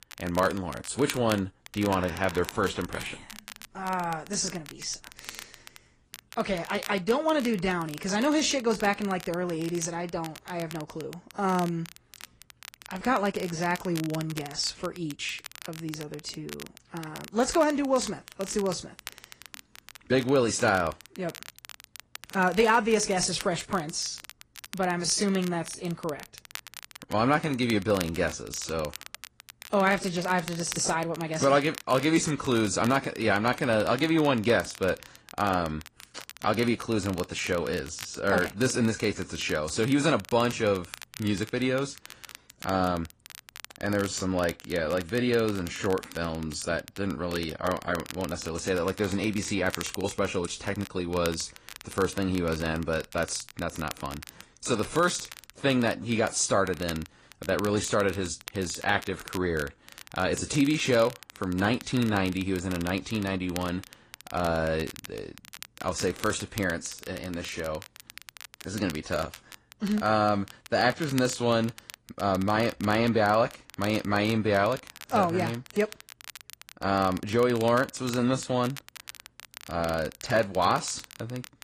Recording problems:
garbled, watery; slightly; nothing above 9.5 kHz
crackle, like an old record; noticeable; 15 dB below the speech

